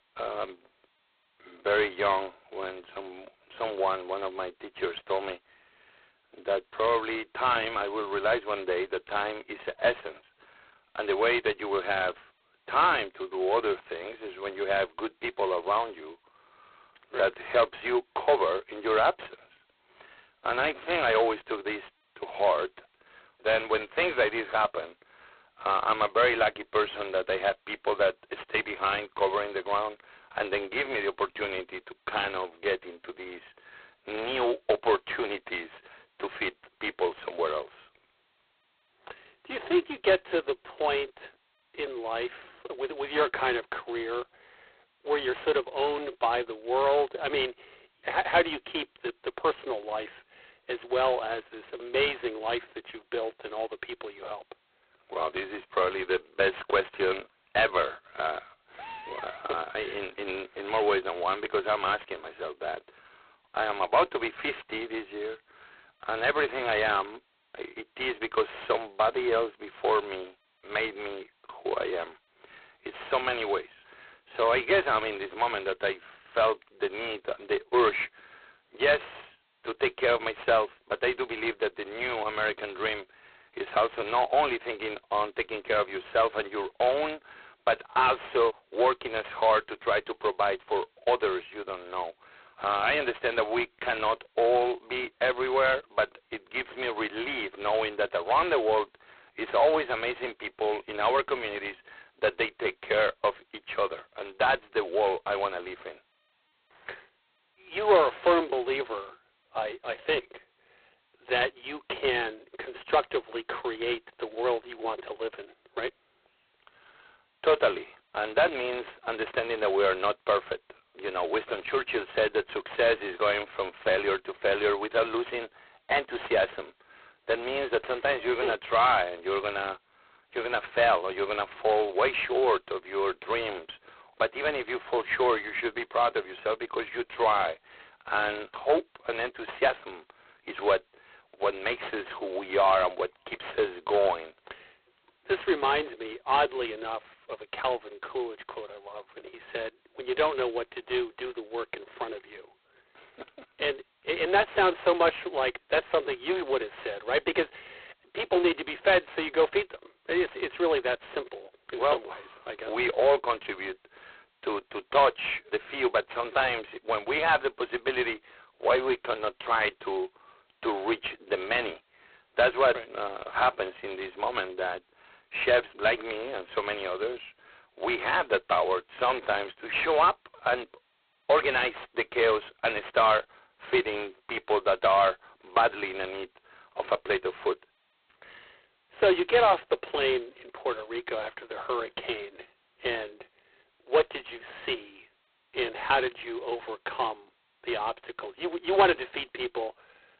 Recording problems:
phone-call audio; poor line; nothing above 4 kHz
distortion; slight; 15 dB below the speech

